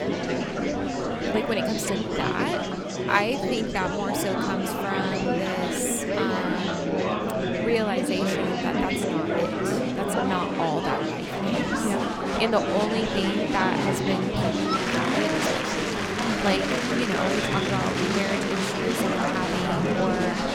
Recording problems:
murmuring crowd; very loud; throughout; 3 dB above the speech

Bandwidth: 17.5 kHz